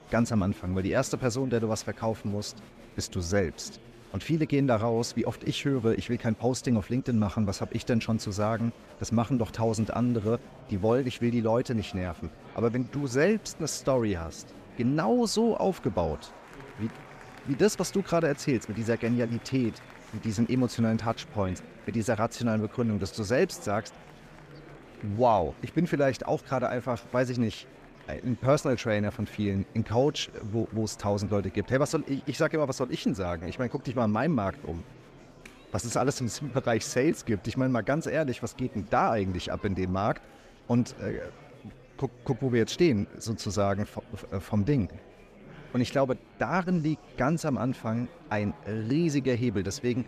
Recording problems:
murmuring crowd; faint; throughout; 20 dB below the speech

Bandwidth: 14.5 kHz